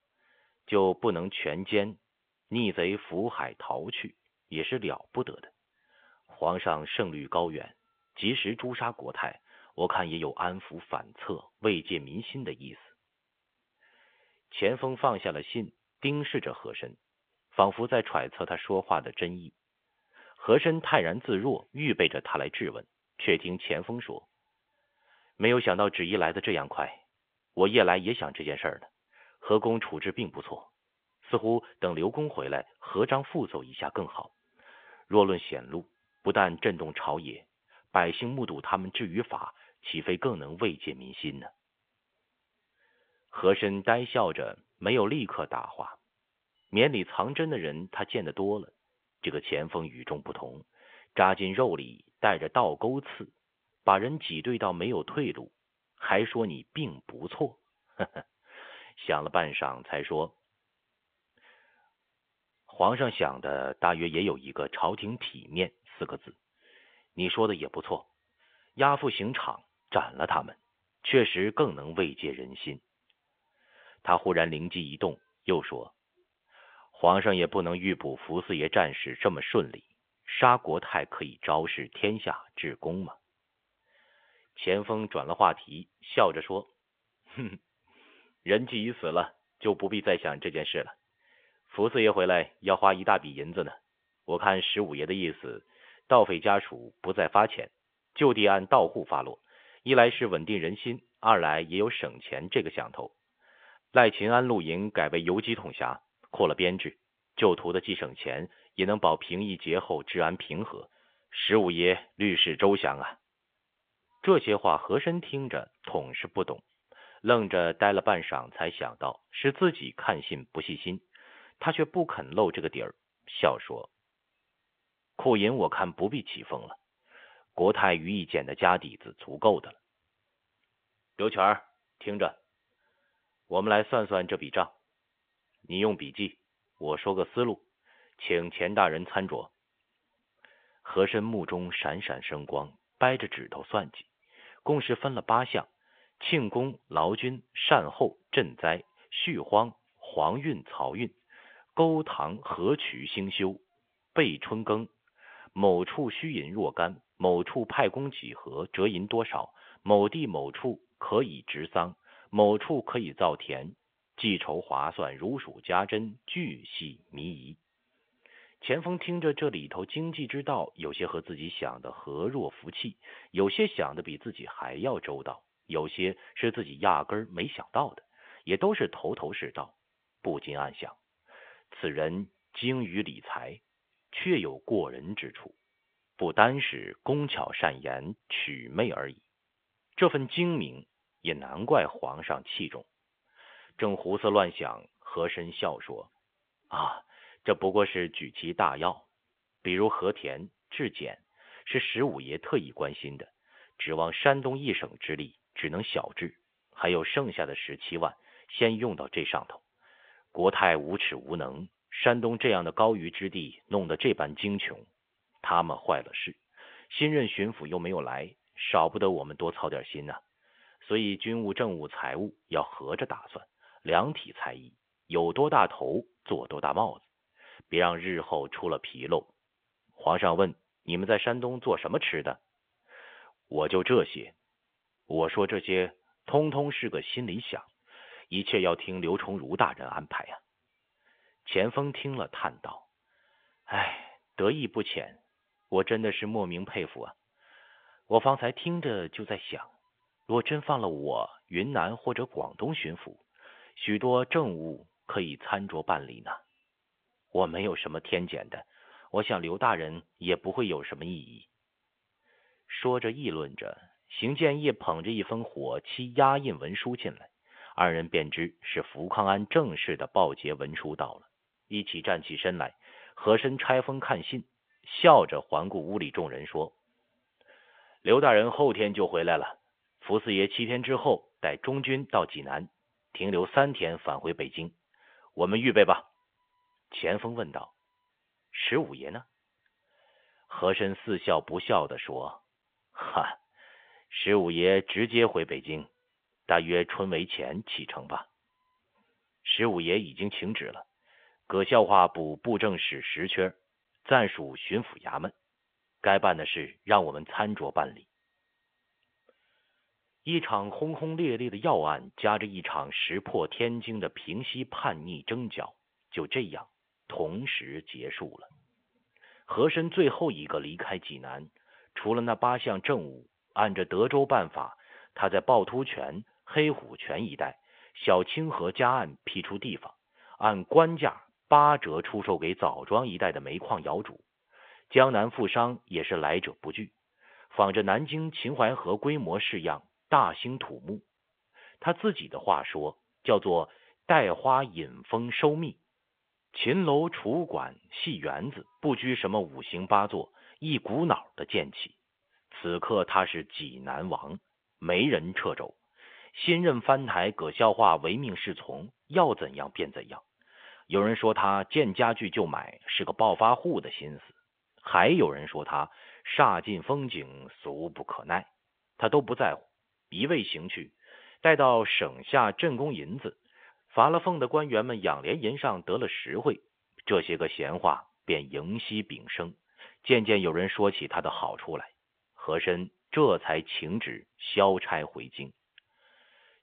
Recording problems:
phone-call audio; nothing above 3.5 kHz

